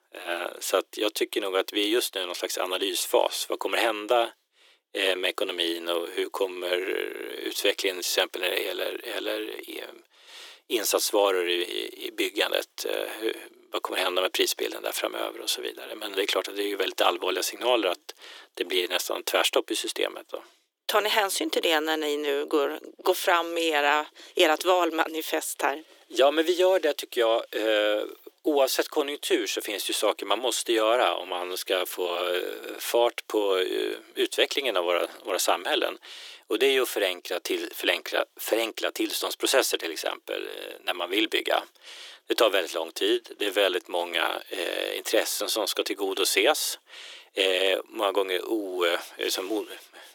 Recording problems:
thin; very; fading below 350 Hz

